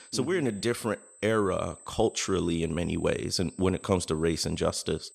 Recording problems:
high-pitched whine; faint; throughout; 8.5 kHz, 20 dB below the speech

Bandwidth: 13.5 kHz